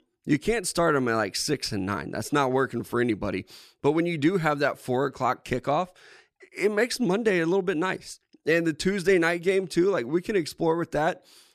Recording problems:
none

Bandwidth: 14 kHz